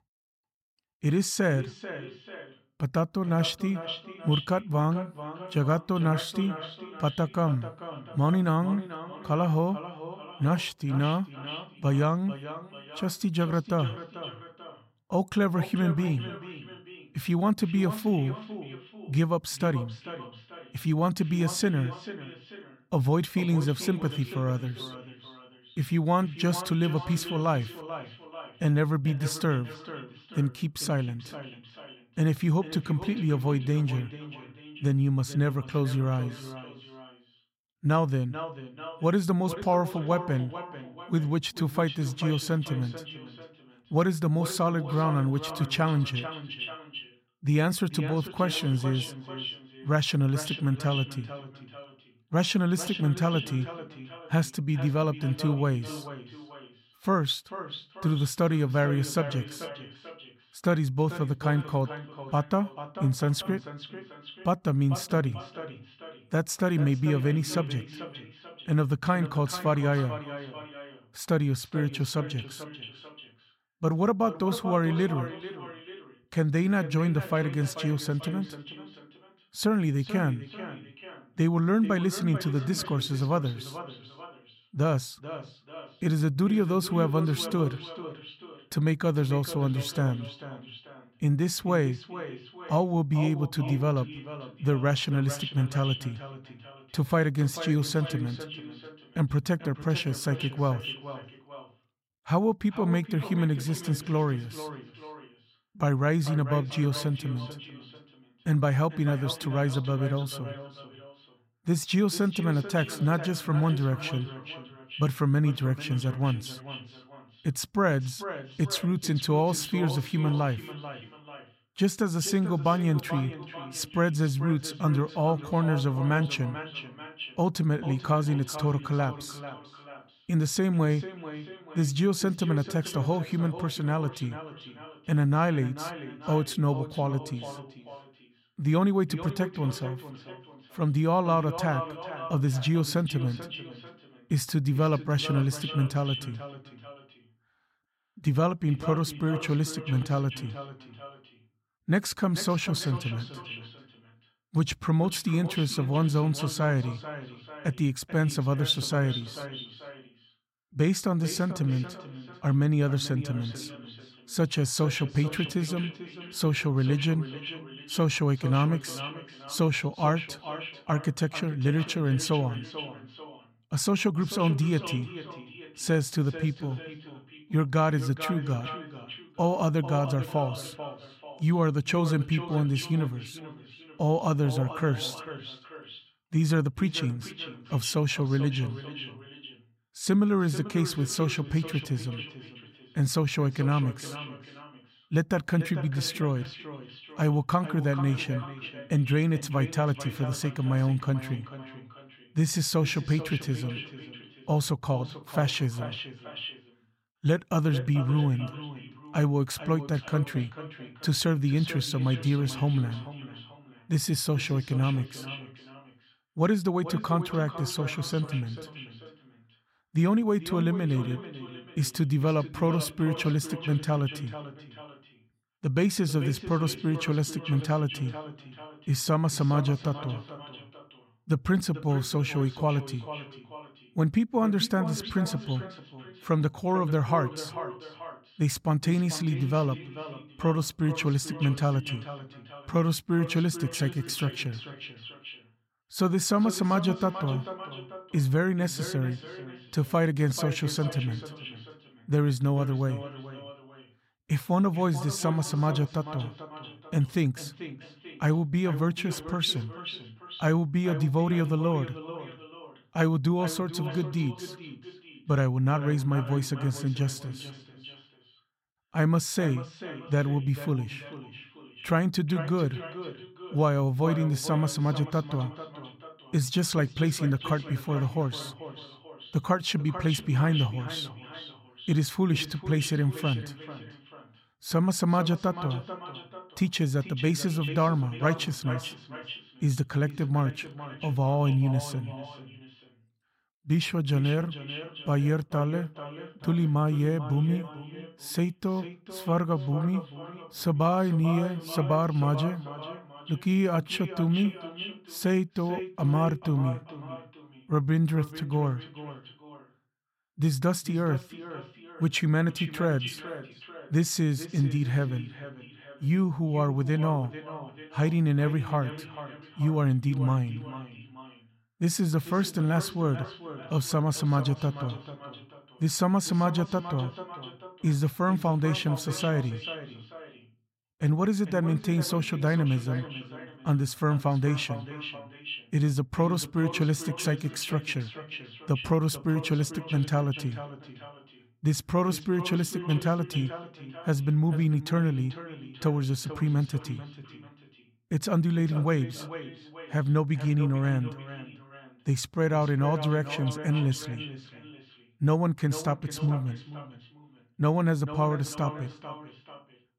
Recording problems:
echo of what is said; noticeable; throughout; 440 ms later, 15 dB below the speech

